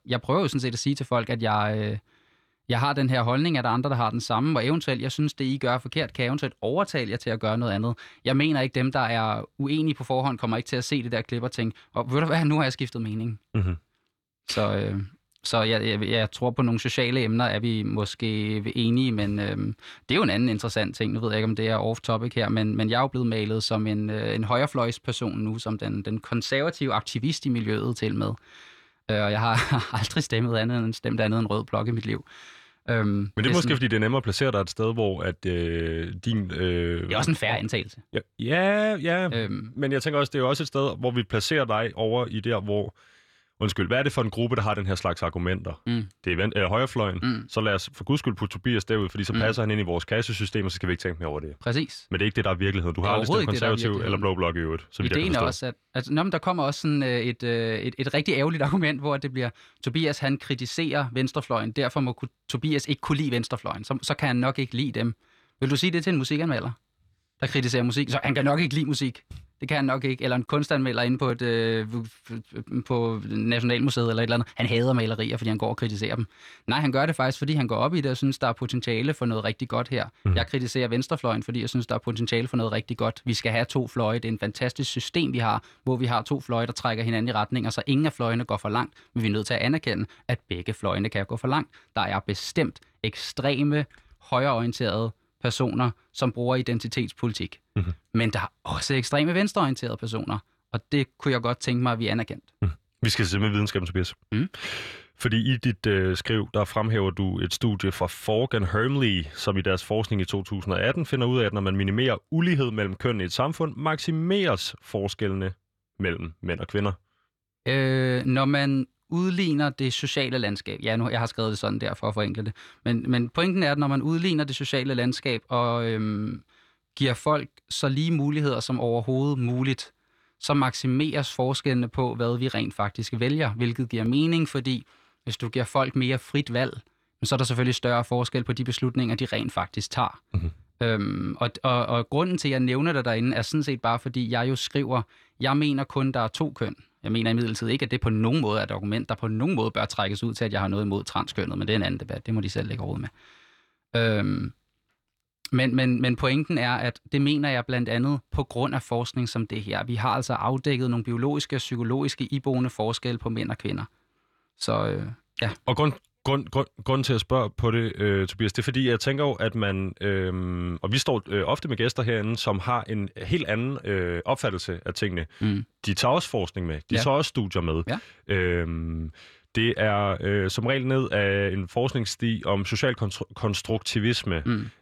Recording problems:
none

